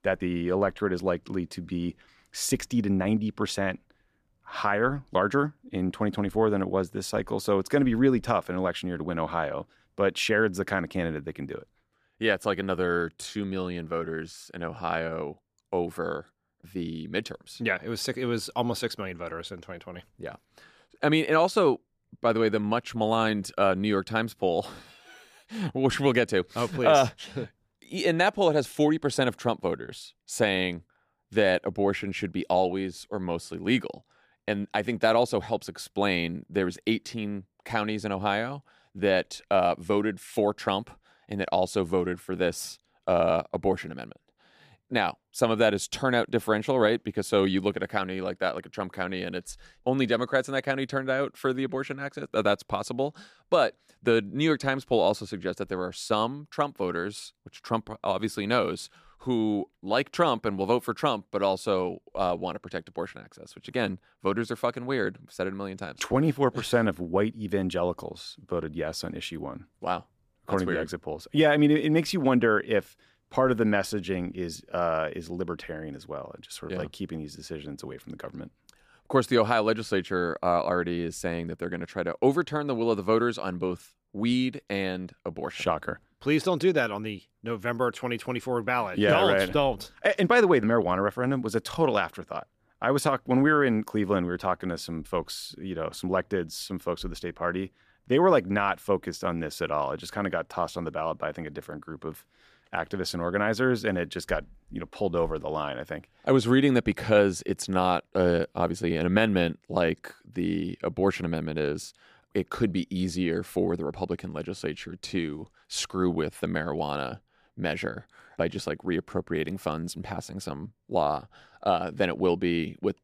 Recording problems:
none

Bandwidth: 14.5 kHz